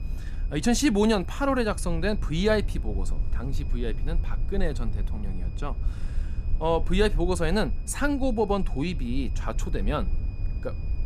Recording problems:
high-pitched whine; faint; throughout; 2.5 kHz, 30 dB below the speech
low rumble; faint; throughout; 20 dB below the speech

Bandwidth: 15 kHz